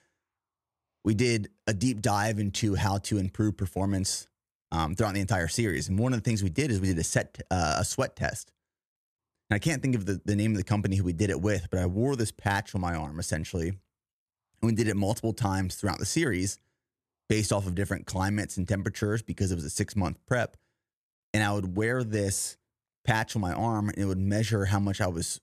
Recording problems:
none

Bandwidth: 13.5 kHz